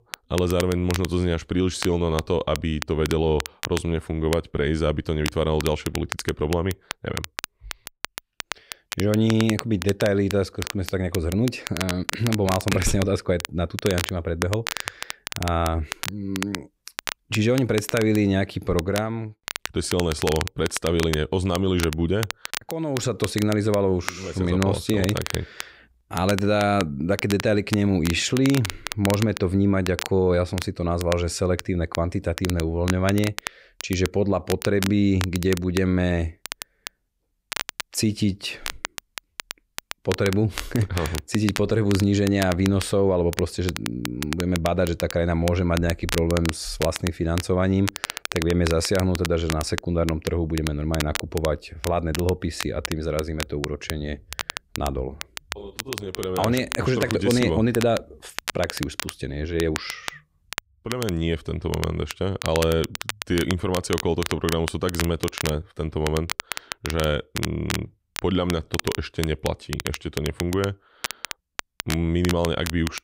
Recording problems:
crackle, like an old record; loud; 9 dB below the speech

